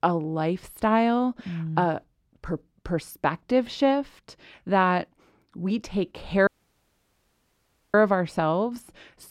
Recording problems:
audio cutting out; at 6.5 s for 1.5 s

